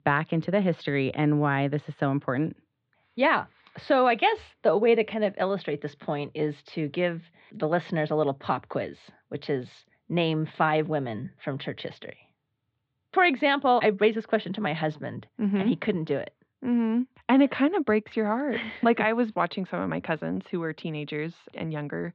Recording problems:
muffled; slightly; fading above 3.5 kHz

